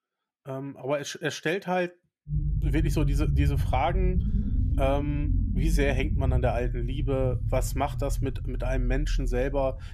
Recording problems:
low rumble; noticeable; from 2.5 s on; 10 dB below the speech

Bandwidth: 14.5 kHz